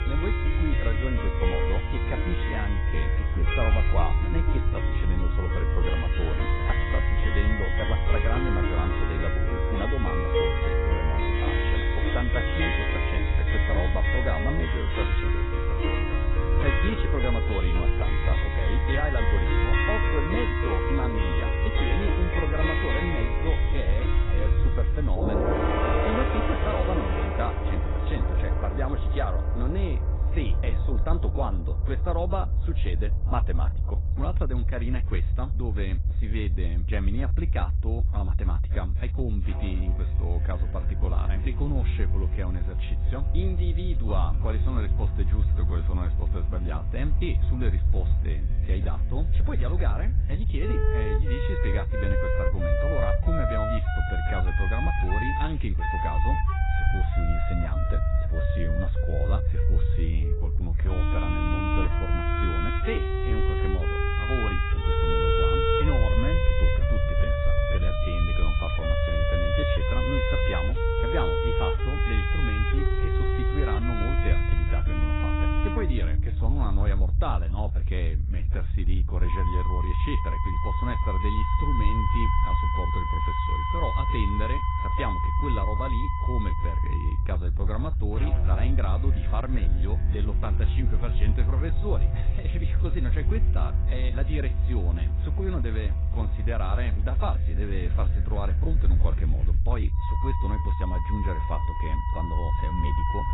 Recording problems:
garbled, watery; badly; nothing above 4 kHz
background music; very loud; throughout; 3 dB above the speech
low rumble; loud; throughout; 9 dB below the speech

